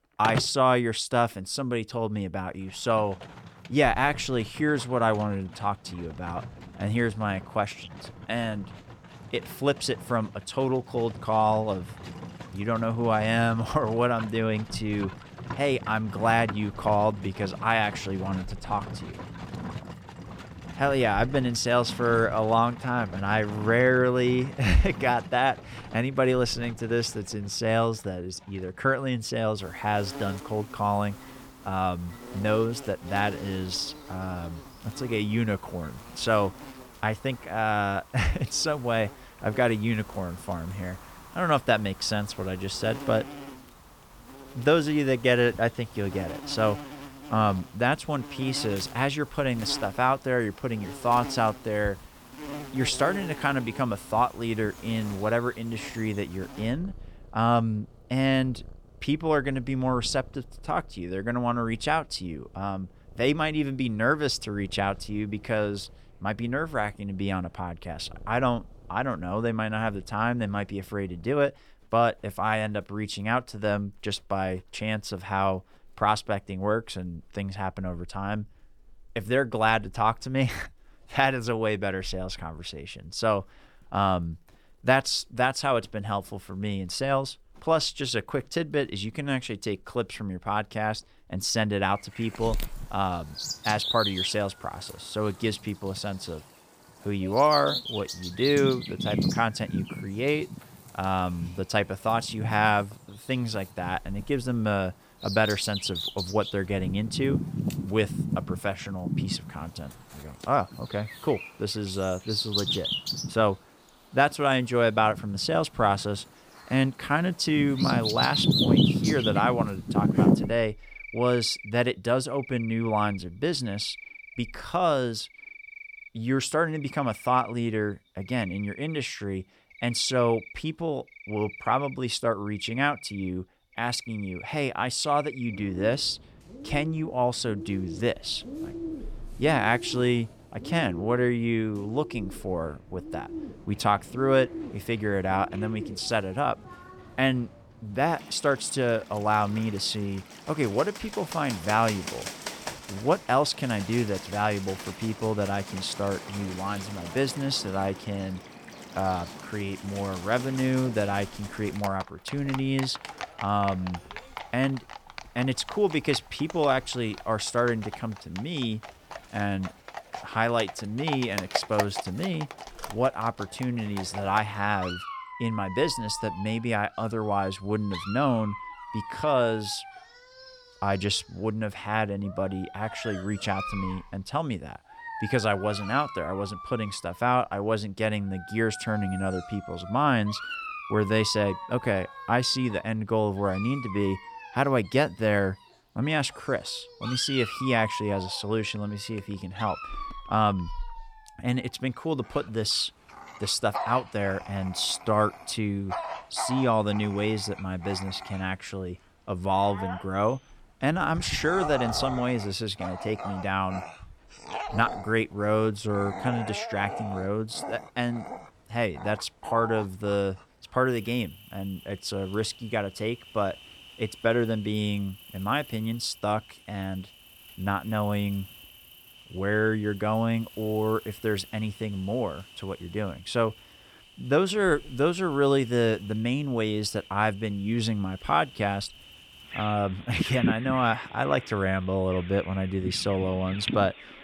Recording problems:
animal sounds; loud; throughout; 9 dB below the speech

